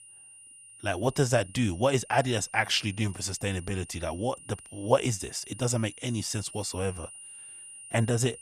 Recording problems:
high-pitched whine; noticeable; throughout; 9.5 kHz, 15 dB below the speech

